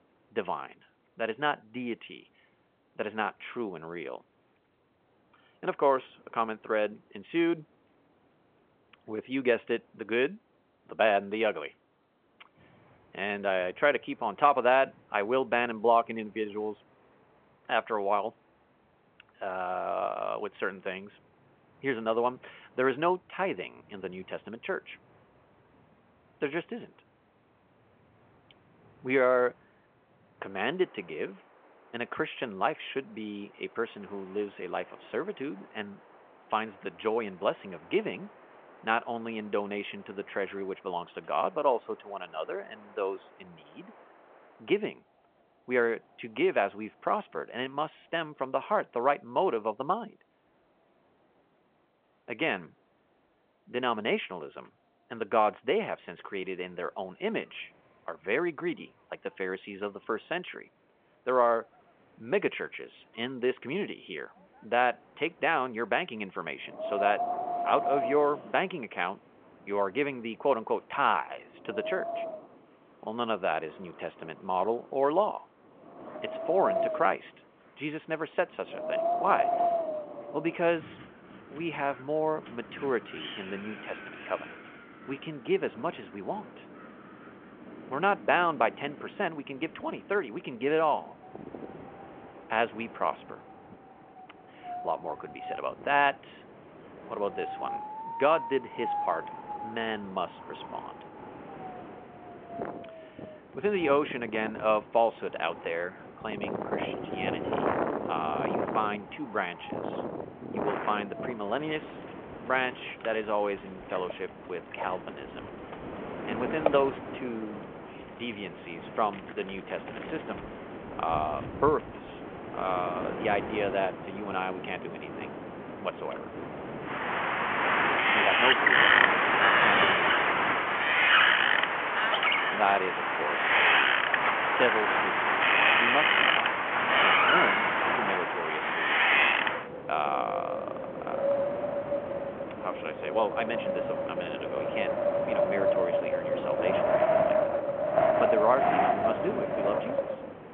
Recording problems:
phone-call audio
wind in the background; very loud; throughout; 4 dB above the speech

